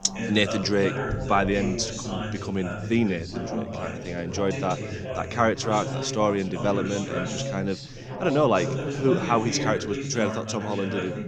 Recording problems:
background chatter; loud; throughout; 4 voices, 5 dB below the speech

